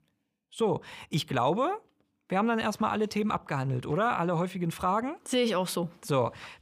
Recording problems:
none

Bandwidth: 15 kHz